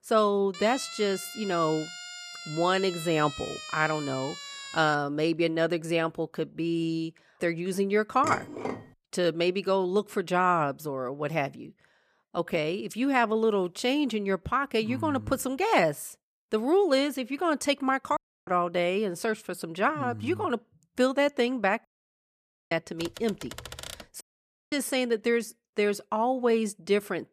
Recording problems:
siren; faint; from 0.5 to 5 s; peak 10 dB below the speech
clattering dishes; noticeable; at 8 s; peak 7 dB below the speech
audio cutting out; at 18 s, at 22 s for 1 s and at 24 s for 0.5 s
keyboard typing; faint; from 23 to 24 s; peak 10 dB below the speech

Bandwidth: 14.5 kHz